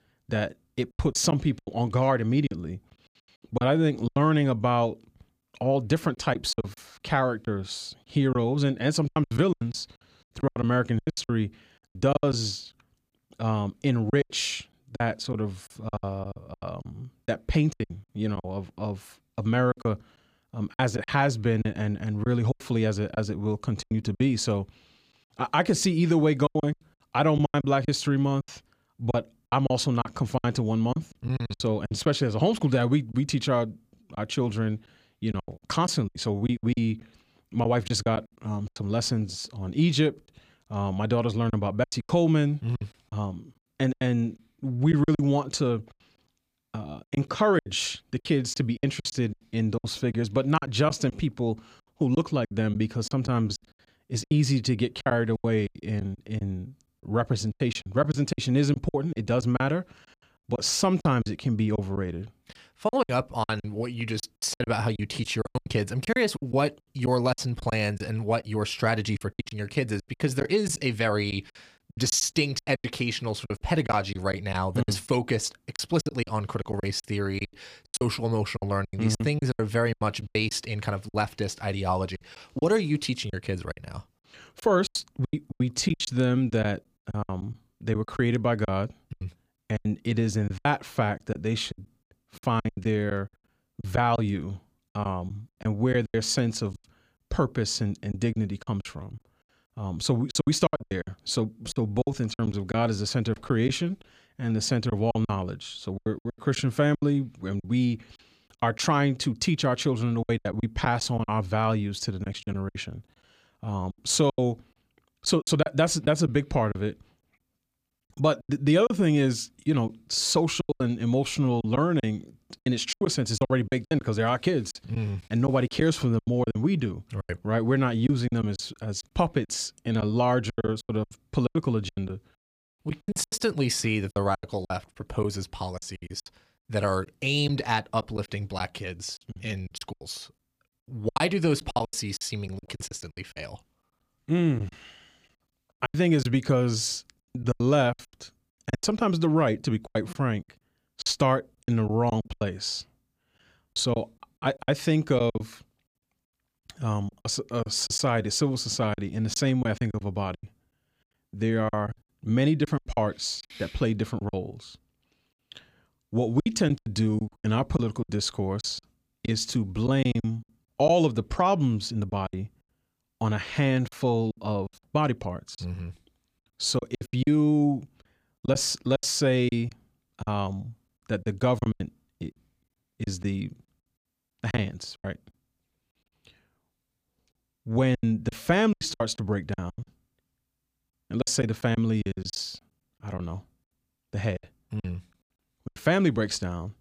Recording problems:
choppy; very; 13% of the speech affected

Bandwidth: 15 kHz